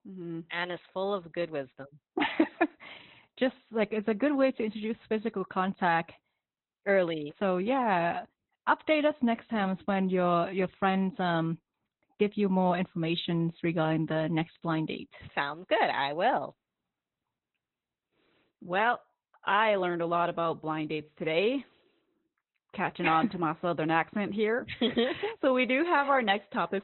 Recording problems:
high frequencies cut off; severe; nothing above 4 kHz
garbled, watery; slightly

